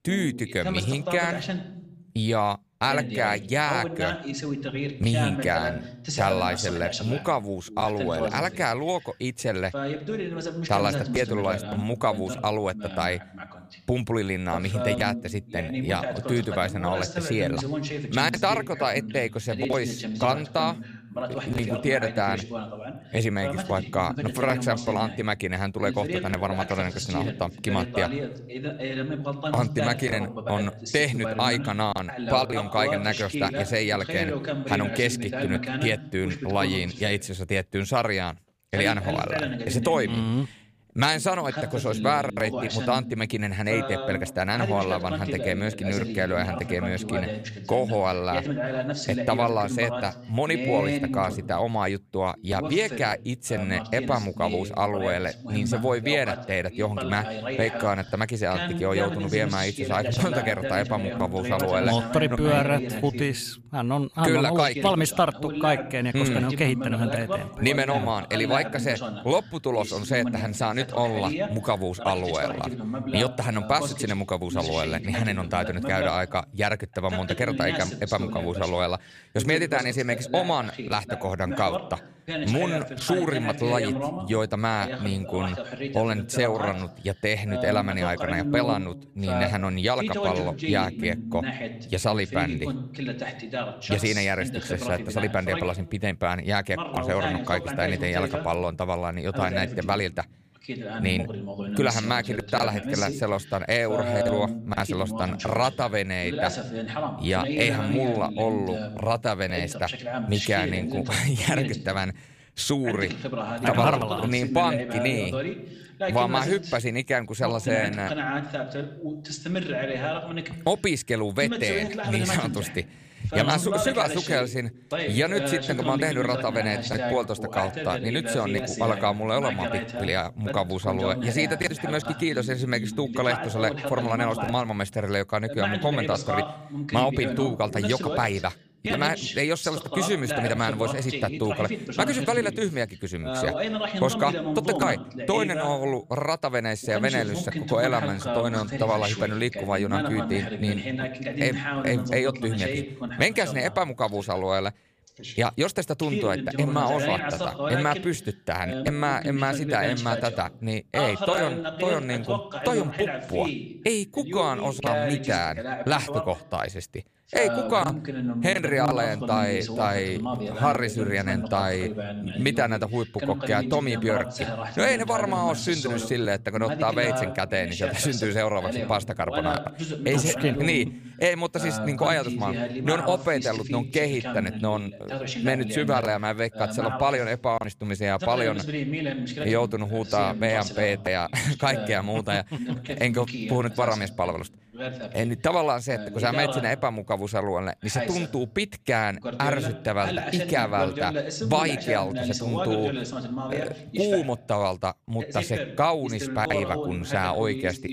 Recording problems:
voice in the background; loud; throughout; 5 dB below the speech

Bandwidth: 15 kHz